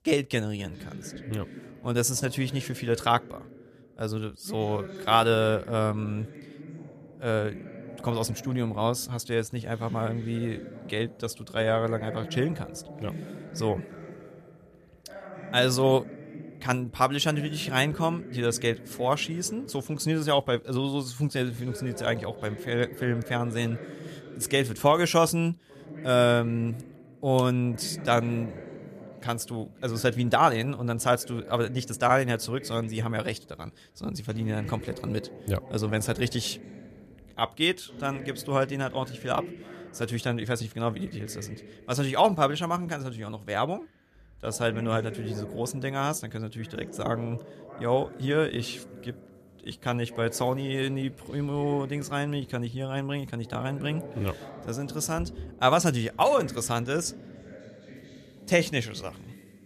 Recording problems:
voice in the background; noticeable; throughout; 15 dB below the speech

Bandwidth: 14.5 kHz